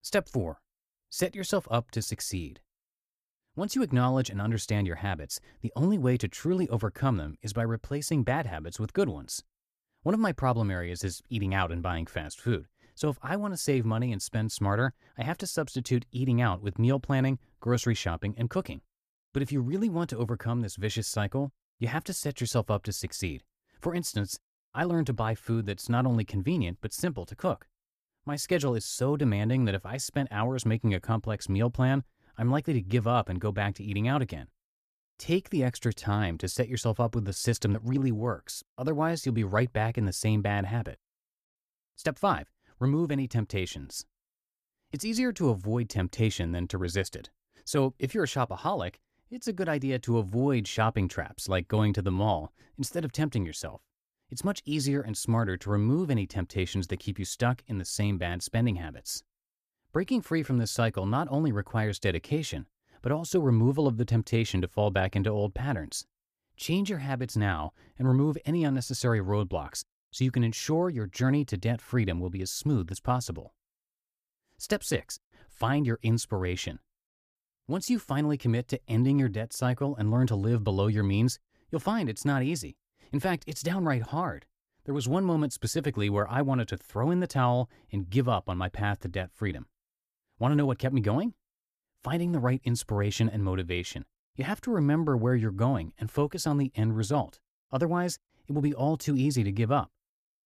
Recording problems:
none

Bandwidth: 14.5 kHz